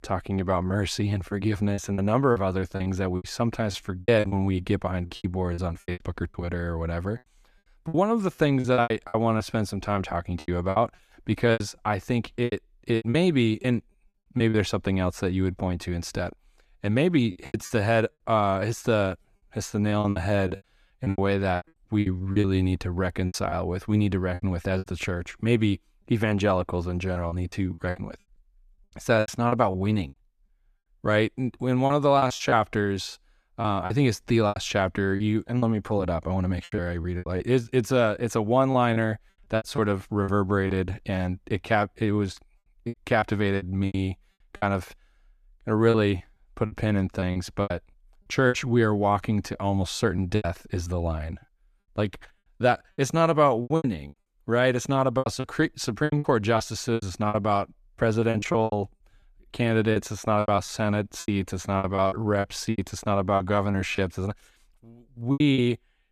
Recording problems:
choppy; very; 12% of the speech affected

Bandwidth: 14.5 kHz